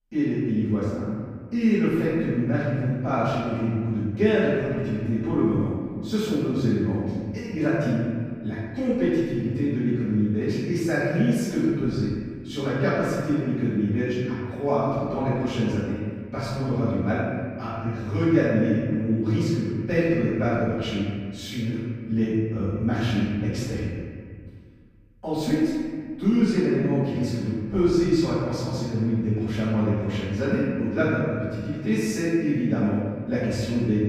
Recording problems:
room echo; strong; dies away in 1.9 s
off-mic speech; far

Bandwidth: 15 kHz